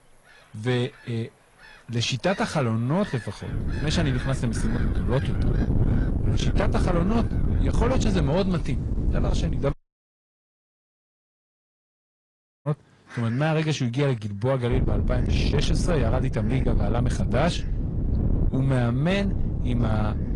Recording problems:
distortion; slight; 10 dB below the speech
garbled, watery; slightly; nothing above 10.5 kHz
wind noise on the microphone; heavy; from 3.5 to 9.5 s and from 15 s on; 7 dB below the speech
animal sounds; noticeable; throughout; 20 dB below the speech
audio cutting out; at 9.5 s for 3 s

